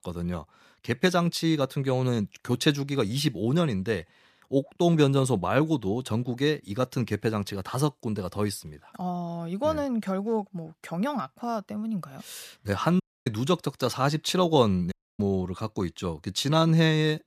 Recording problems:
audio cutting out; at 13 s and at 15 s

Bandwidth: 14.5 kHz